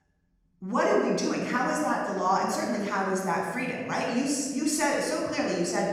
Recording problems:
off-mic speech; far
room echo; noticeable; dies away in 1.5 s

